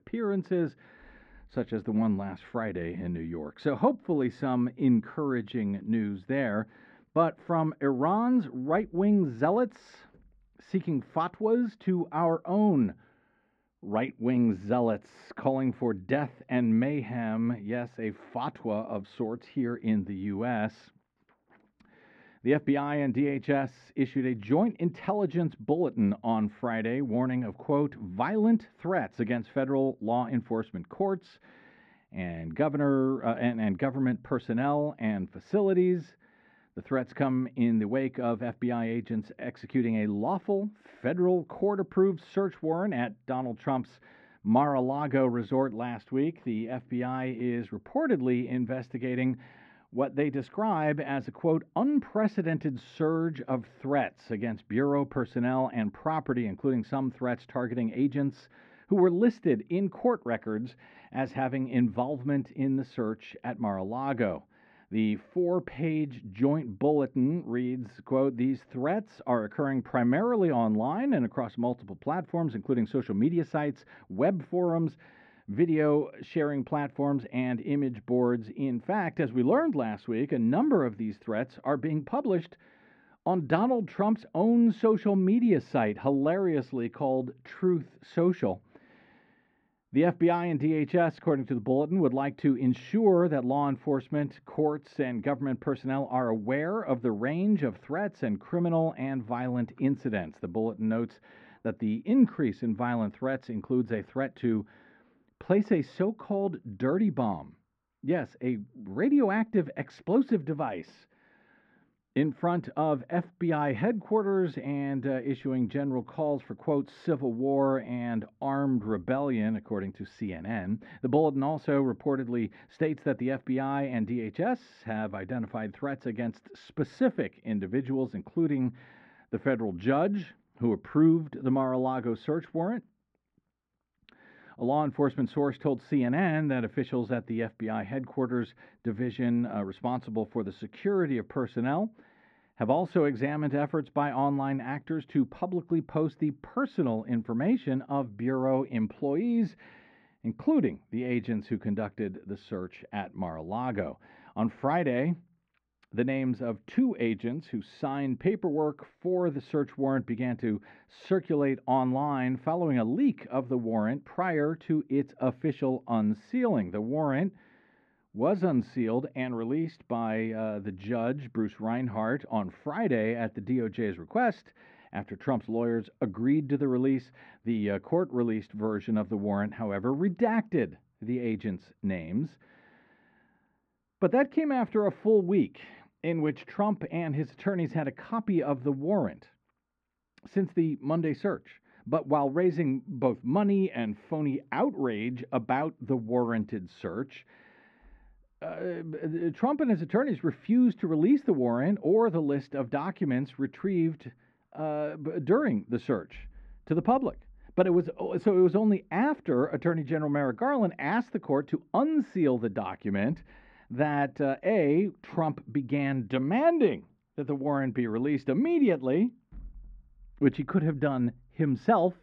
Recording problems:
muffled; very; fading above 1.5 kHz

